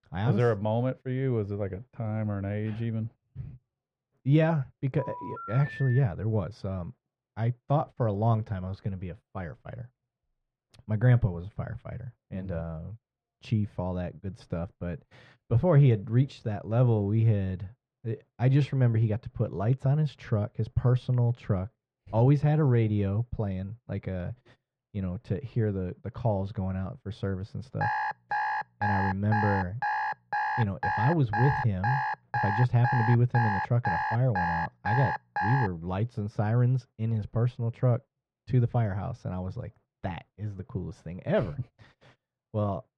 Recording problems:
muffled; very; fading above 1.5 kHz
phone ringing; noticeable; from 5 to 6 s; peak 10 dB below the speech
alarm; noticeable; from 28 to 36 s; peak 1 dB below the speech

